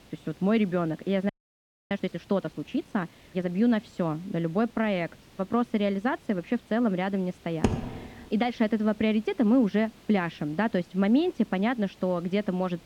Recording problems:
muffled; slightly; fading above 2 kHz
hiss; faint; throughout; 25 dB below the speech
audio freezing; at 1.5 s for 0.5 s
keyboard typing; noticeable; at 7.5 s; peak 1 dB below the speech

